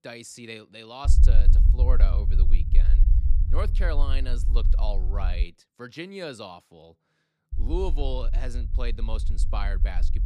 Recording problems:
low rumble; loud; from 1 to 5.5 s and from 7.5 s on; 10 dB below the speech

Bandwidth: 15 kHz